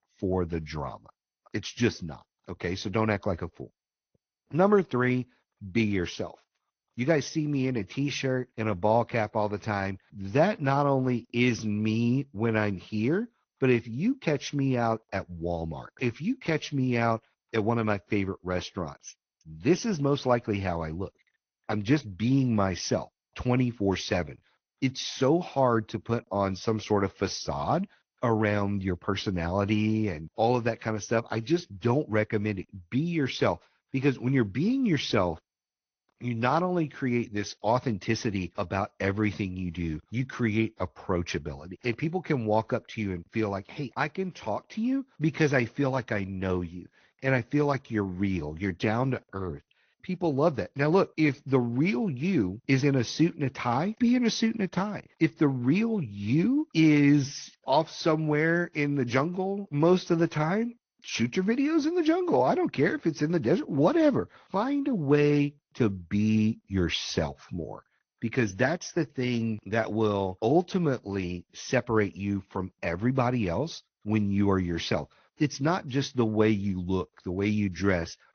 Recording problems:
high frequencies cut off; noticeable; nothing above 6 kHz
garbled, watery; slightly

